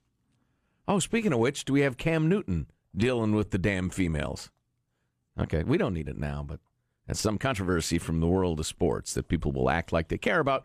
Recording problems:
uneven, jittery; strongly; from 3 to 8.5 s

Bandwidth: 14.5 kHz